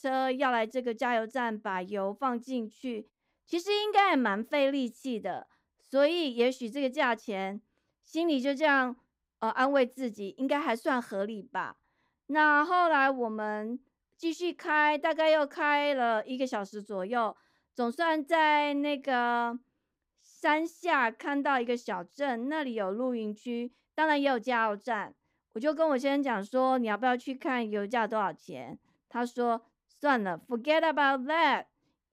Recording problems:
uneven, jittery; strongly; from 8 to 28 s

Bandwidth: 15.5 kHz